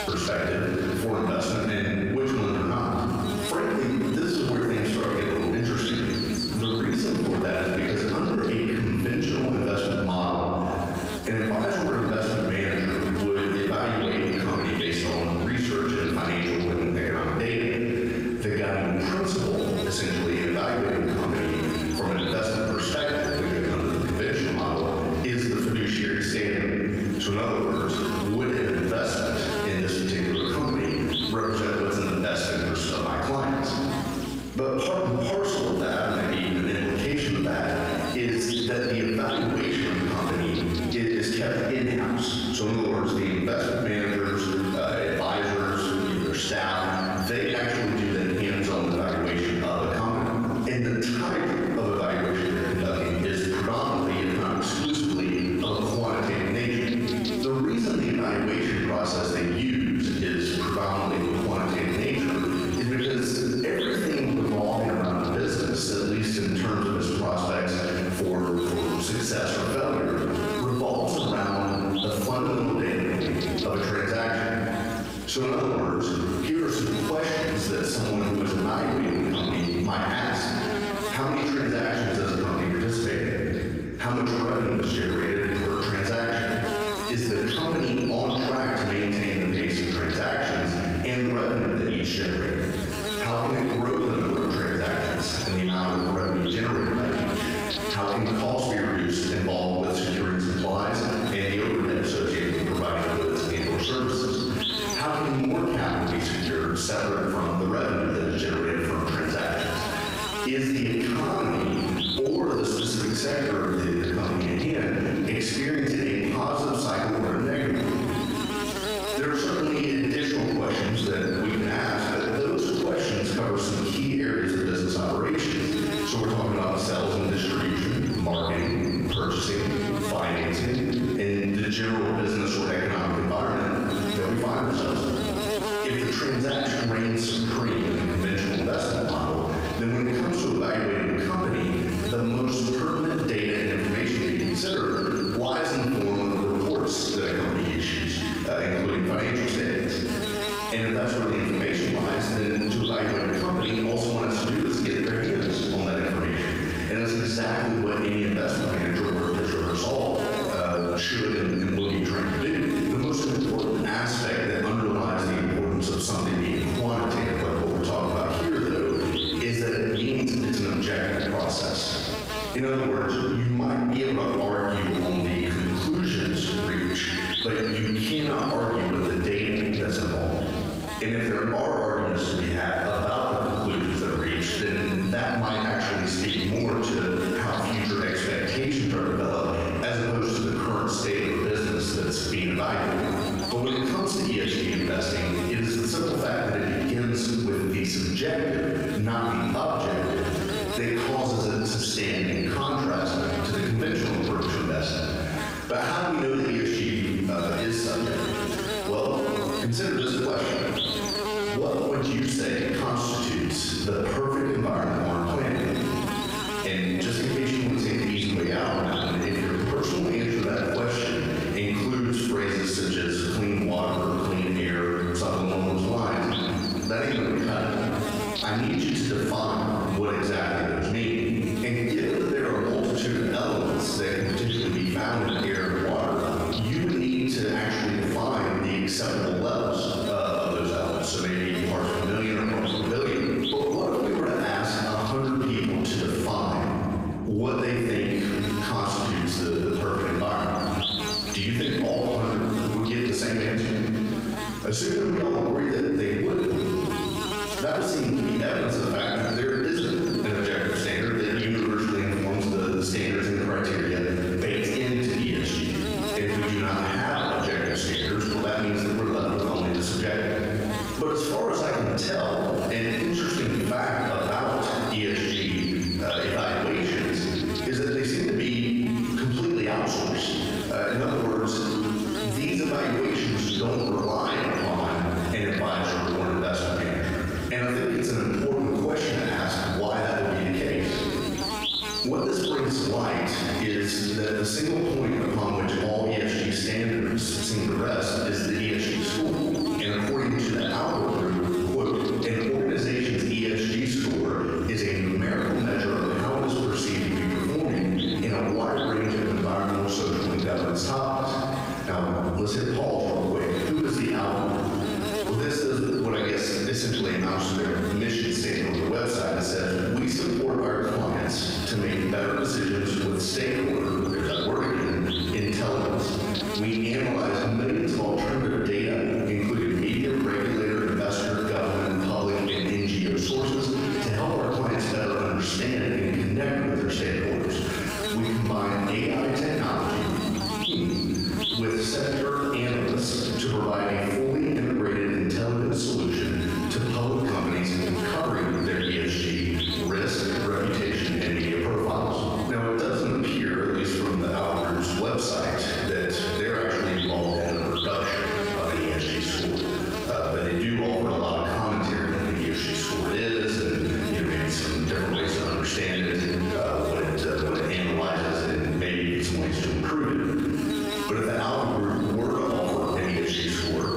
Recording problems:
room echo; strong; dies away in 1.3 s
off-mic speech; far
squashed, flat; somewhat
electrical hum; loud; throughout; 60 Hz, 9 dB below the speech

